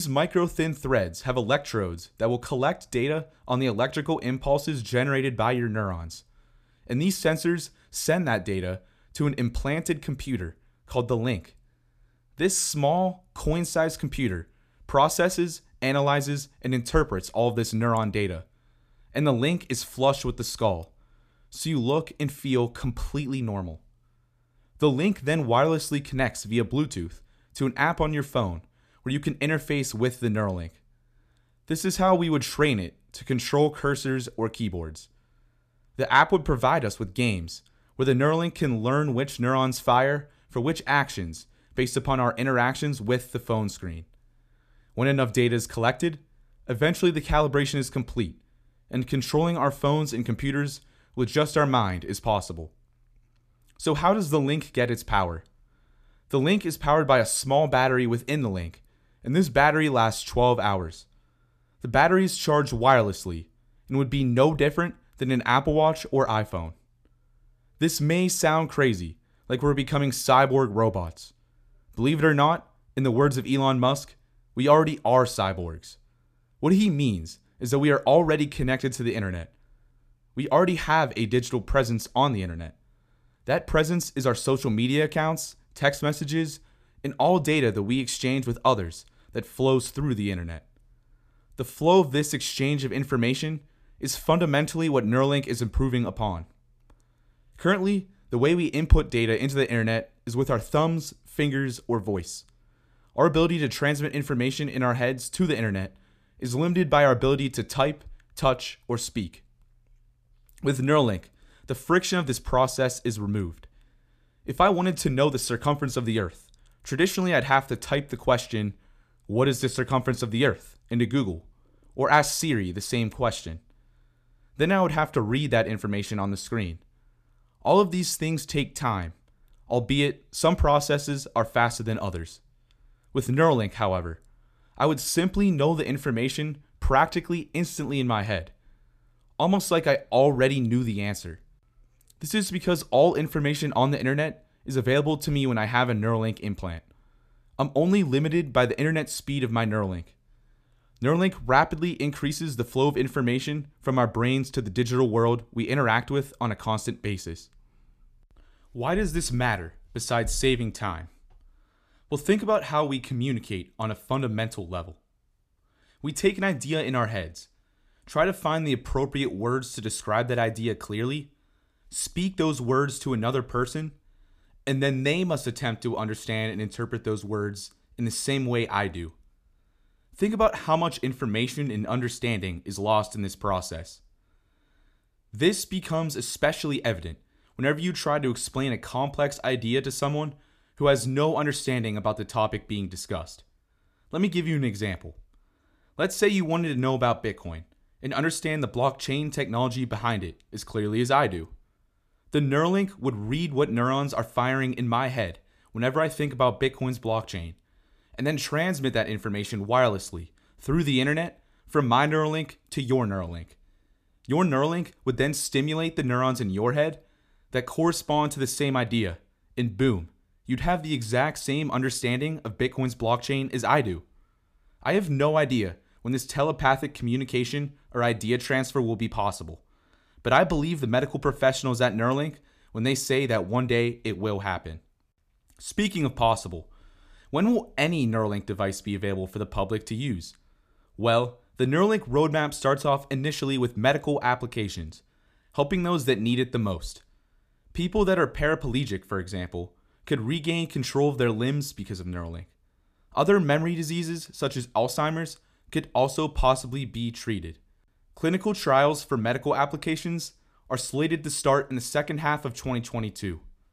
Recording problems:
abrupt cut into speech; at the start

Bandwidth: 14.5 kHz